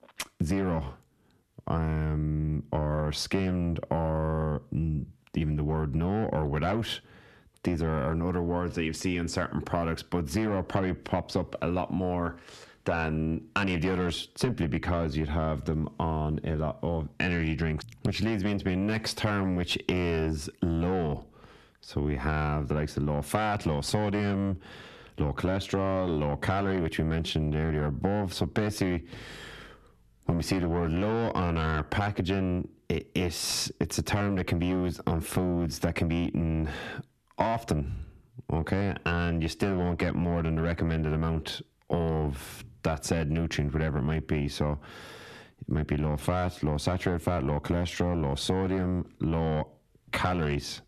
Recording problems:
distortion; heavy; 7 dB below the speech
squashed, flat; somewhat

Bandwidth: 13.5 kHz